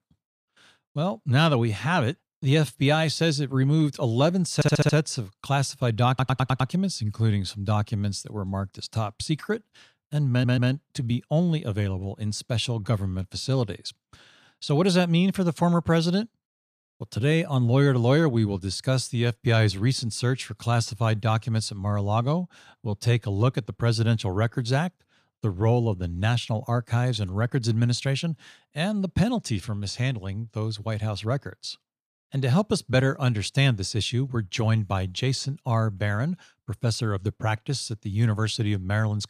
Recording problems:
audio stuttering; at 4.5 s, at 6 s and at 10 s

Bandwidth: 14.5 kHz